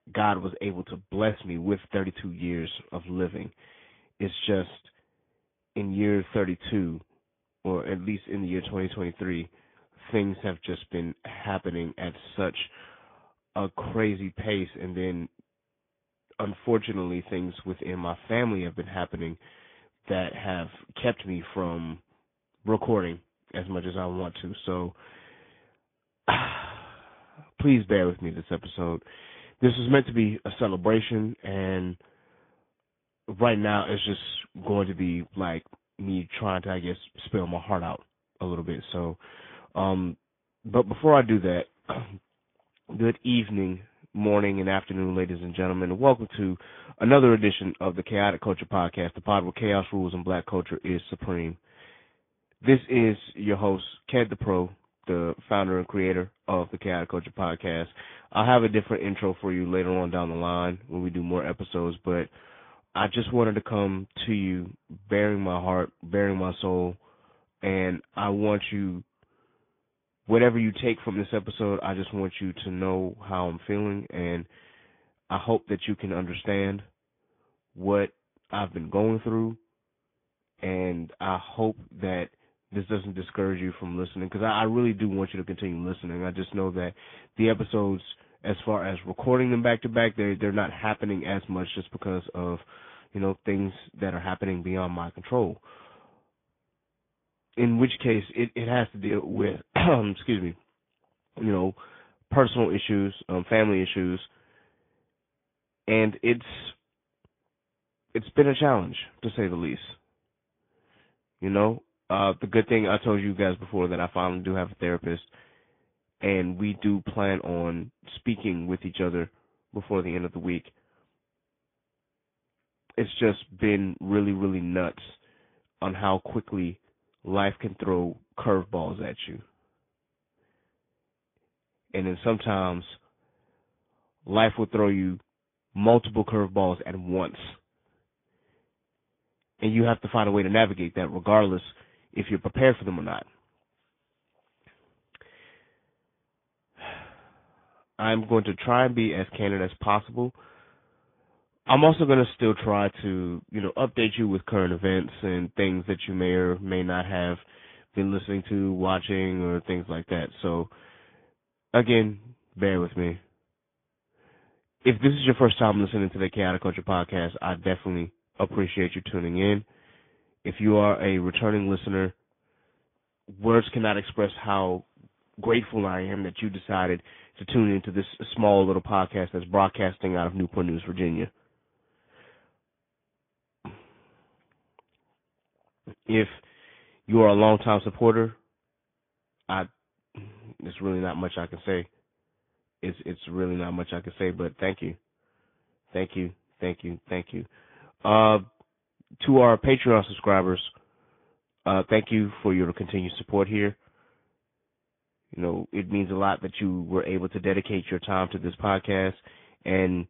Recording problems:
high frequencies cut off; severe; nothing above 3.5 kHz
garbled, watery; slightly

